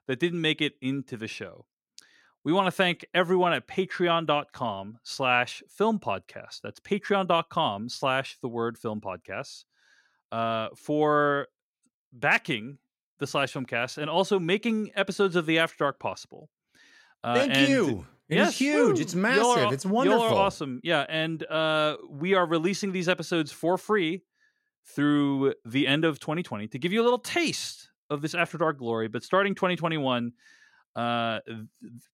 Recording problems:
none

